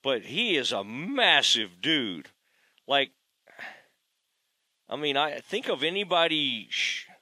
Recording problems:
thin; very slightly; fading below 750 Hz

